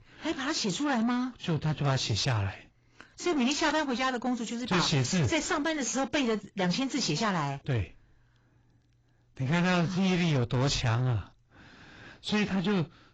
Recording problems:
distortion; heavy; 7 dB below the speech
garbled, watery; badly; nothing above 7.5 kHz

